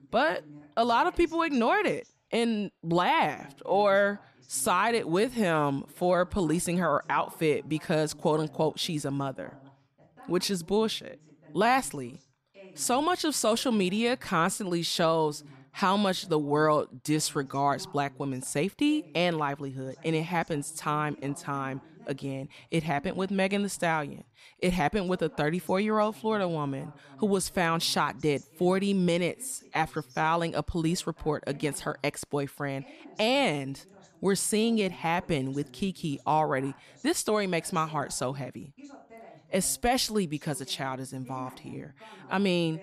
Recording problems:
voice in the background; faint; throughout; 25 dB below the speech

